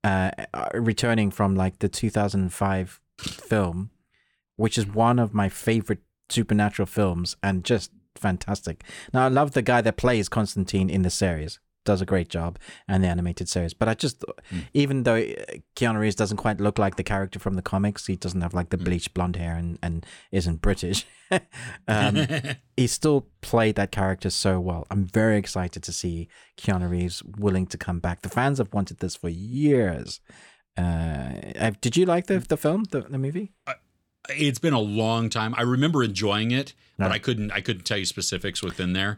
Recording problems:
none

